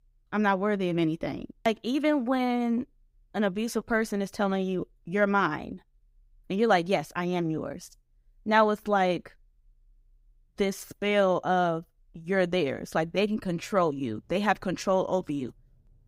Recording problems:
none

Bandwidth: 15.5 kHz